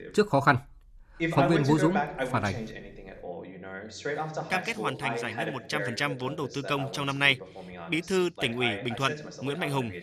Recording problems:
voice in the background; loud; throughout; 7 dB below the speech

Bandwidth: 13.5 kHz